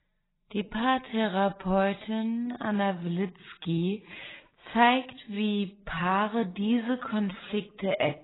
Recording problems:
garbled, watery; badly; nothing above 4 kHz
wrong speed, natural pitch; too slow; 0.5 times normal speed

